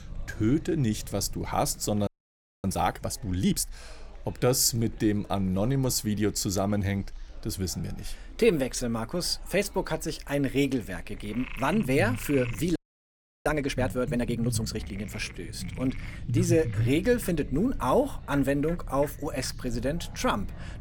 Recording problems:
animal sounds; noticeable; throughout; 20 dB below the speech
low rumble; noticeable; throughout; 20 dB below the speech
chatter from many people; faint; throughout; 30 dB below the speech
audio freezing; at 2 s for 0.5 s and at 13 s for 0.5 s

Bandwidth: 17.5 kHz